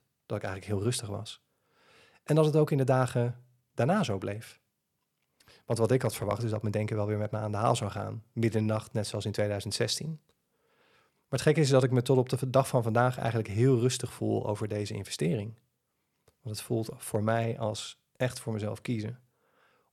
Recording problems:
none

